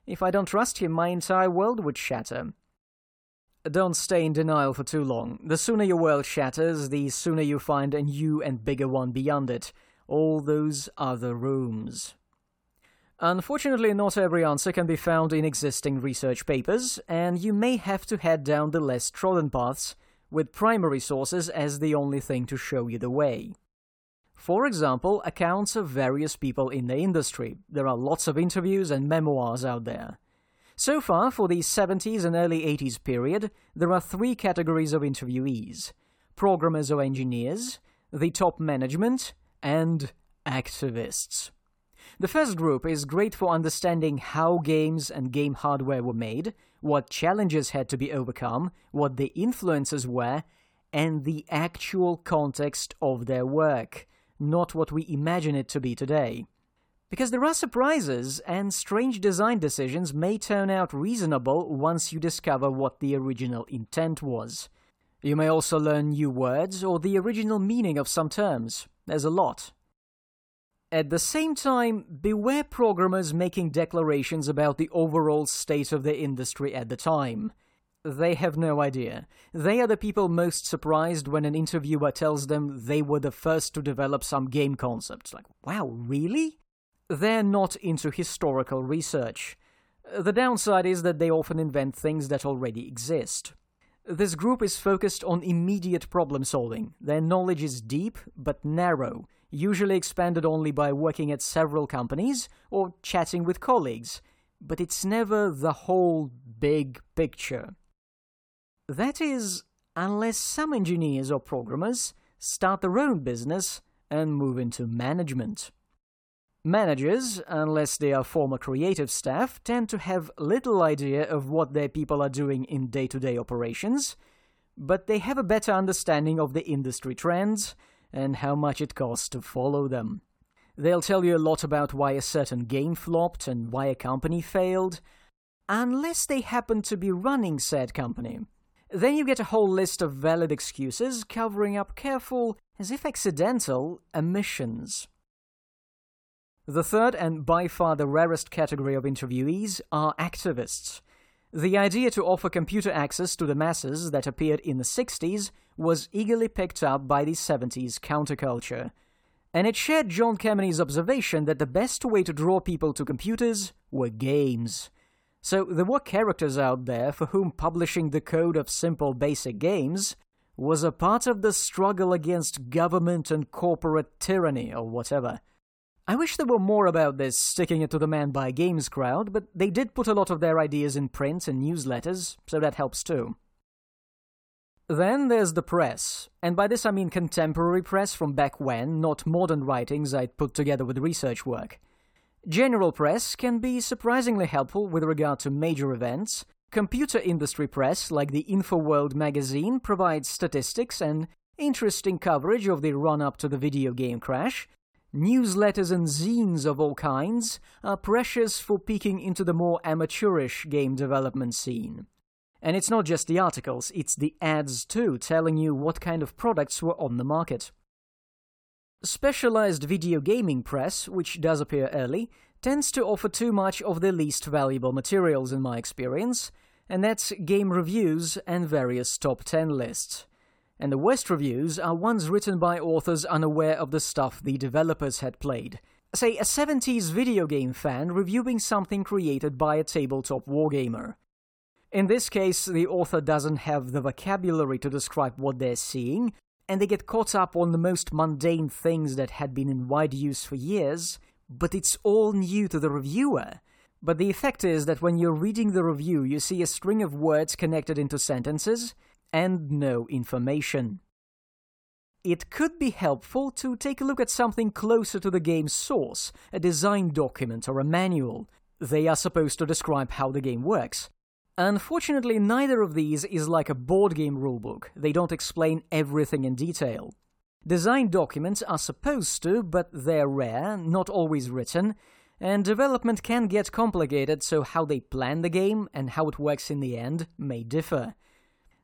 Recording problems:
none

